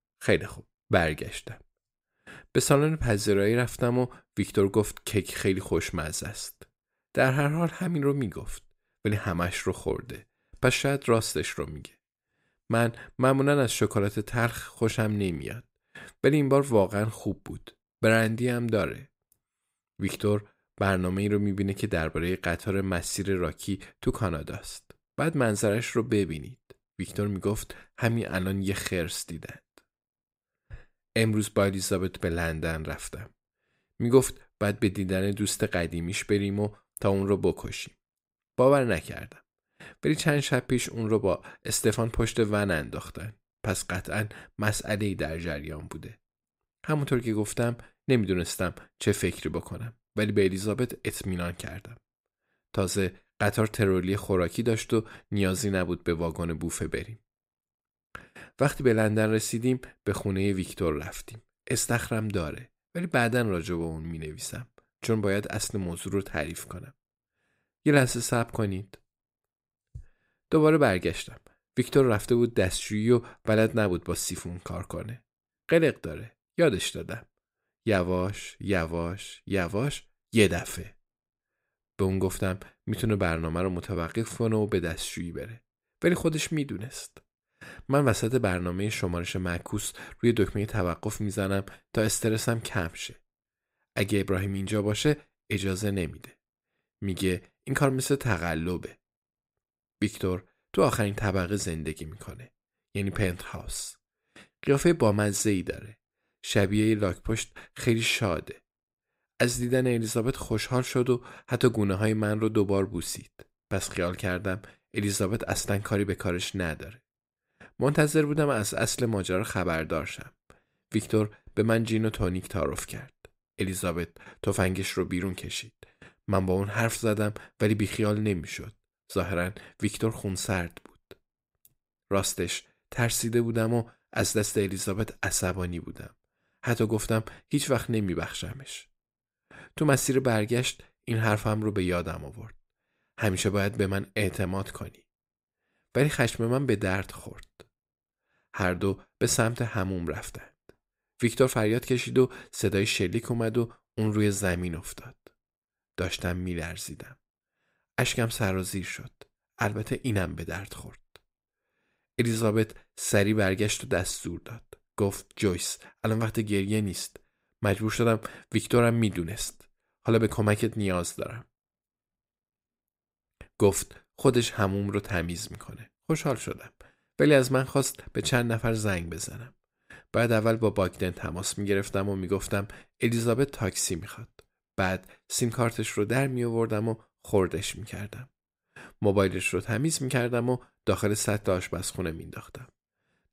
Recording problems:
none

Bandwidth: 15.5 kHz